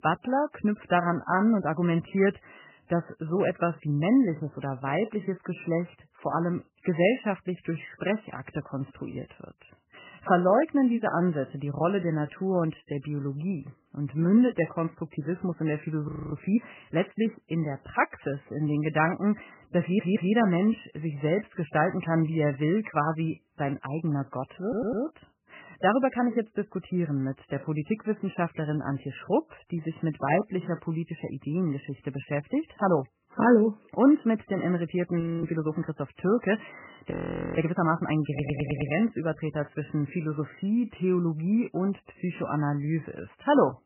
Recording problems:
garbled, watery; badly; nothing above 3 kHz
audio freezing; at 16 s, at 35 s and at 37 s
audio stuttering; at 20 s, at 25 s and at 38 s

